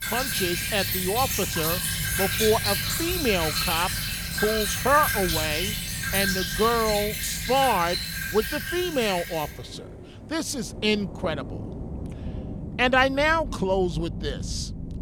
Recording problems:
rain or running water; loud; throughout; 2 dB below the speech

